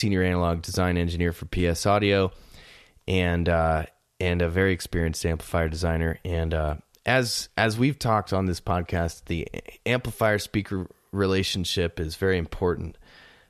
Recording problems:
abrupt cut into speech; at the start

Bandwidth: 13.5 kHz